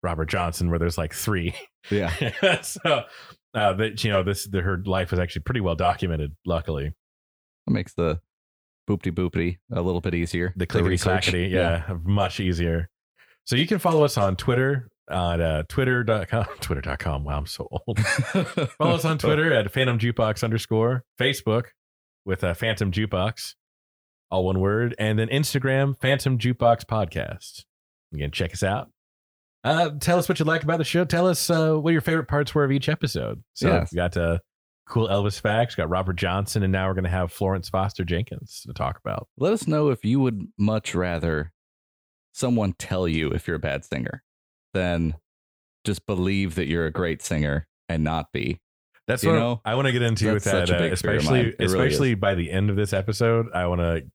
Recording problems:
none

